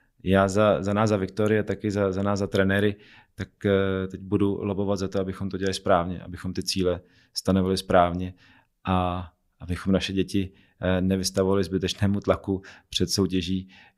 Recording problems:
none

